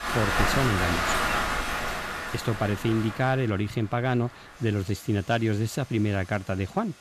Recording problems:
rain or running water; loud; throughout; as loud as the speech

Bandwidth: 14.5 kHz